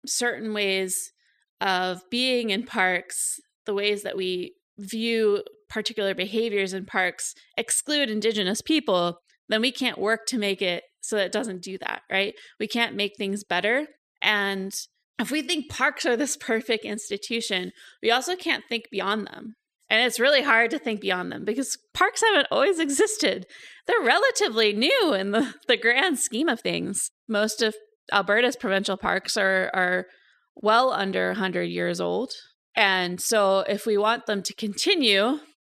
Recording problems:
uneven, jittery; strongly; from 1.5 to 34 s

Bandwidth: 14 kHz